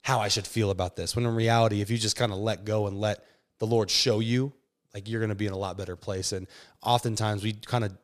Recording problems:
none

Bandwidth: 15 kHz